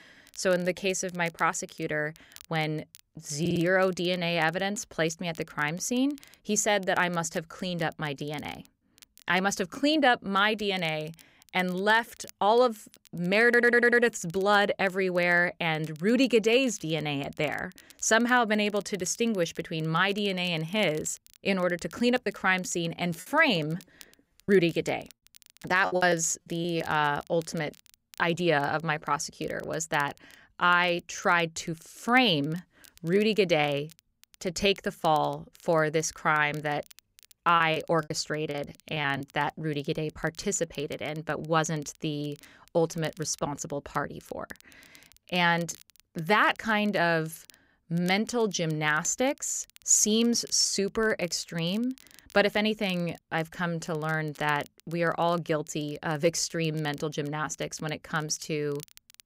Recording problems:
crackle, like an old record; faint; 25 dB below the speech
audio stuttering; at 3.5 s and at 13 s
choppy; very; from 22 to 27 s and from 38 to 39 s; 11% of the speech affected

